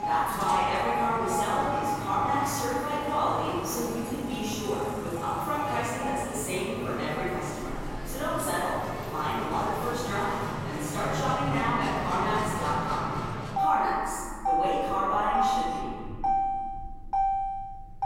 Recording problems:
room echo; strong; dies away in 2.2 s
off-mic speech; far
alarms or sirens; loud; throughout; 5 dB below the speech
traffic noise; loud; throughout; 4 dB below the speech

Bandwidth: 16 kHz